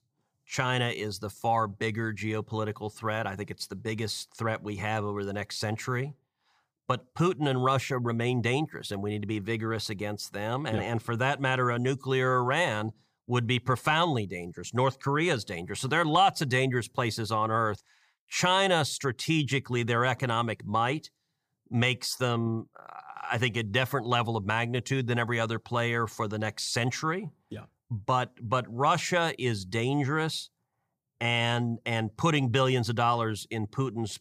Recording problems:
none

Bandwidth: 15 kHz